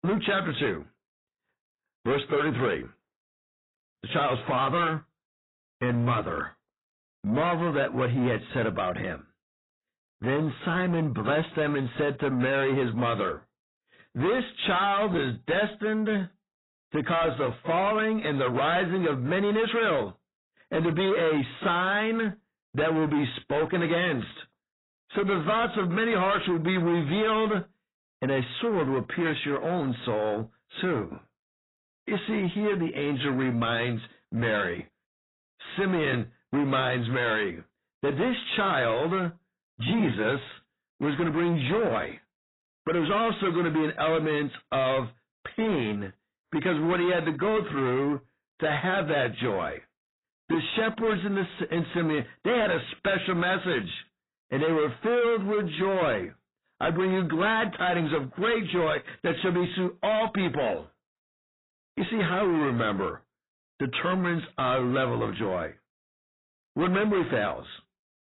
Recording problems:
distortion; heavy; 8 dB below the speech
garbled, watery; badly; nothing above 4 kHz

